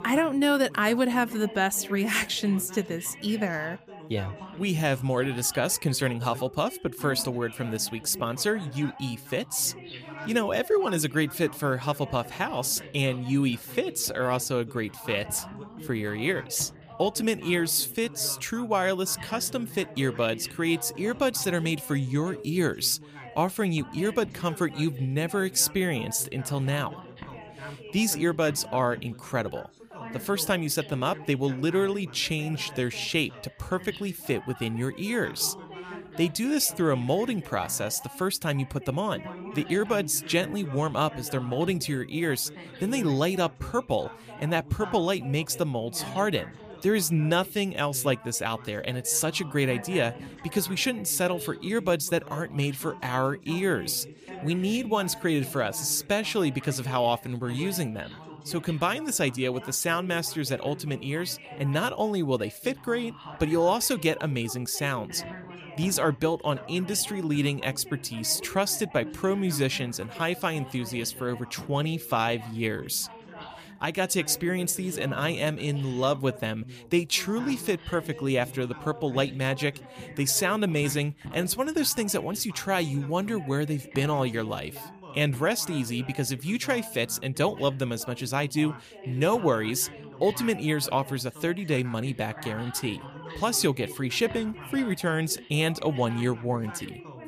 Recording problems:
background chatter; noticeable; throughout; 3 voices, 15 dB below the speech

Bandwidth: 15 kHz